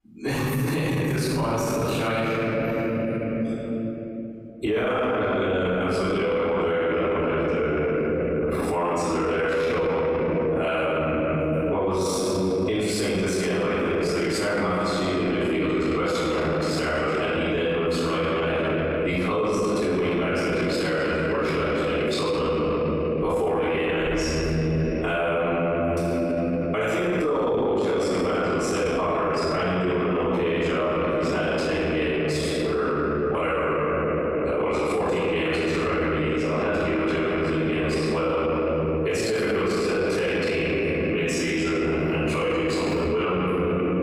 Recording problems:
room echo; strong; dies away in 3 s
off-mic speech; far
squashed, flat; somewhat

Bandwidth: 15.5 kHz